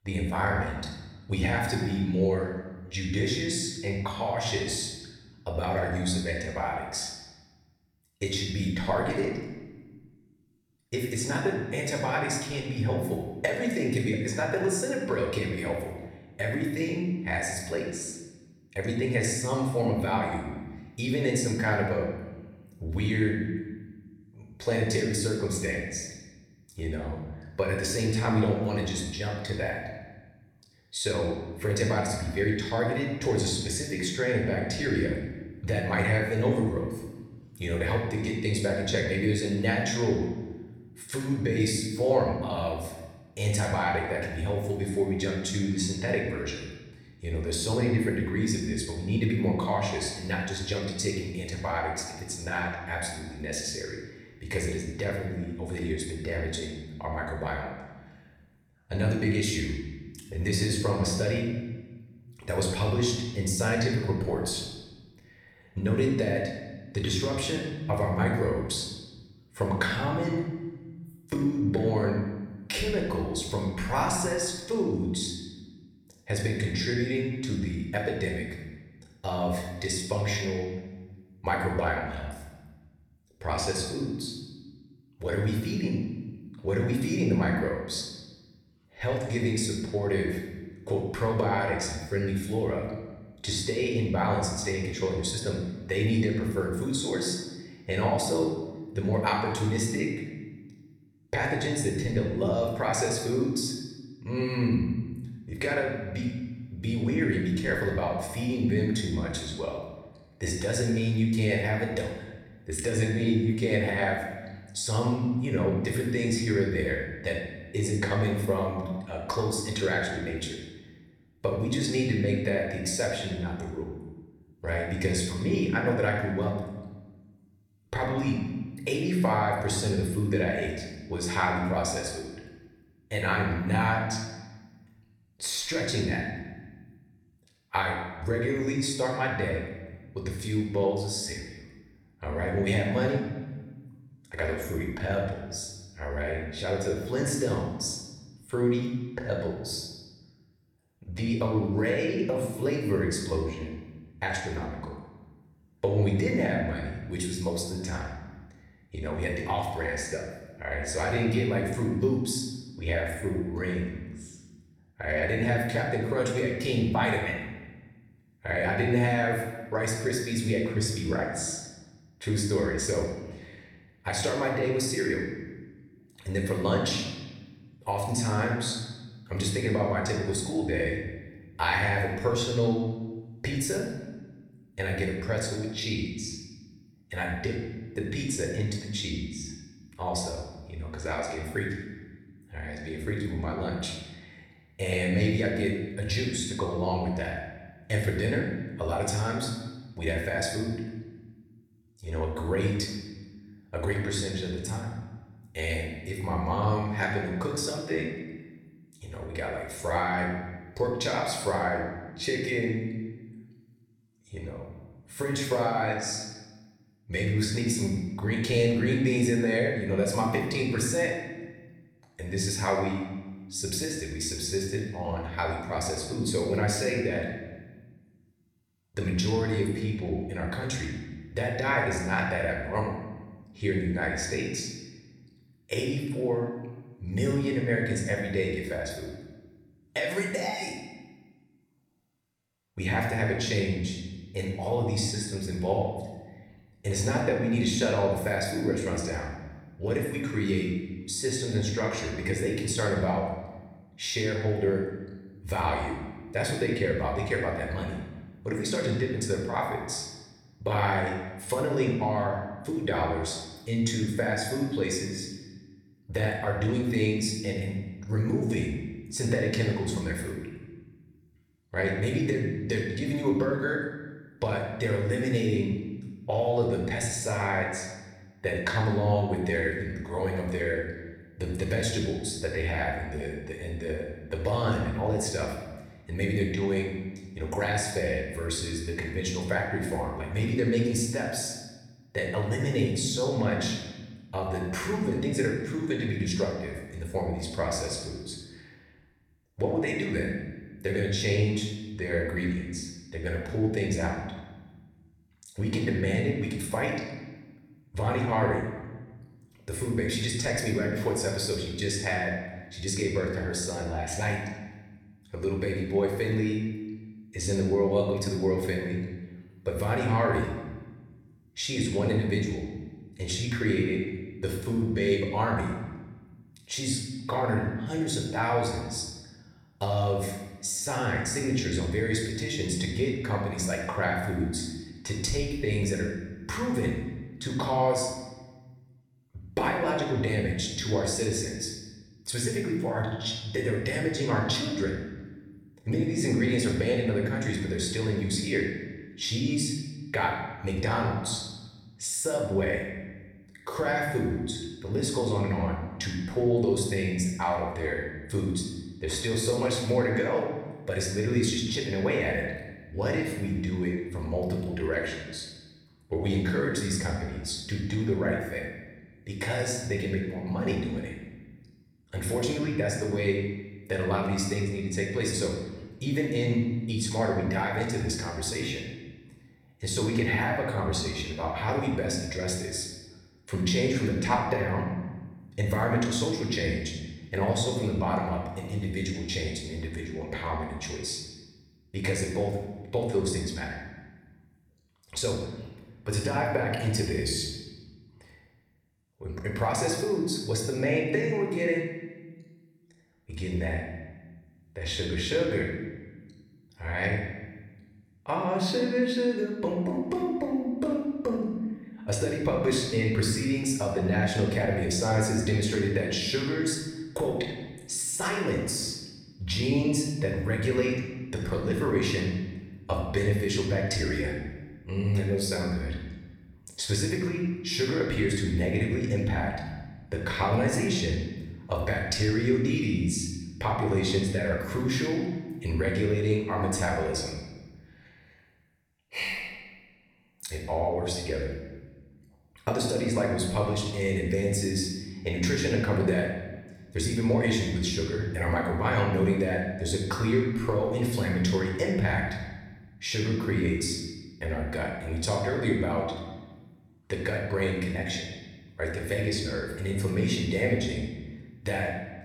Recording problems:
room echo; noticeable; dies away in 1.2 s
off-mic speech; somewhat distant

